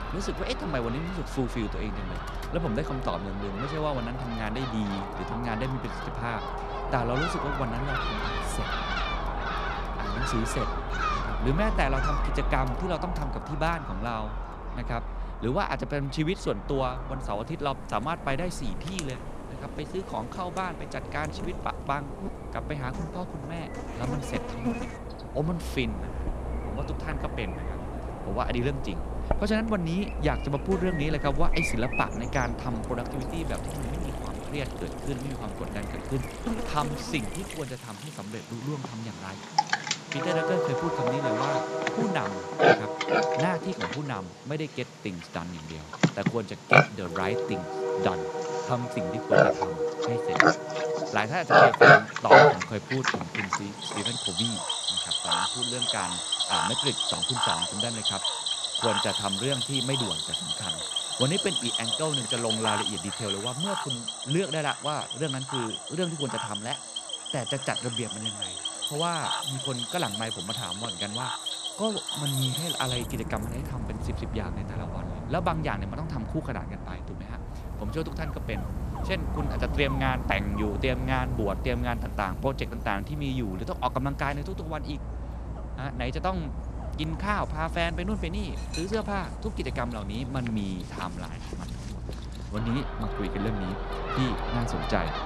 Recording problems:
animal sounds; very loud; throughout; 3 dB above the speech
household noises; noticeable; throughout; 20 dB below the speech

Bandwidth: 14 kHz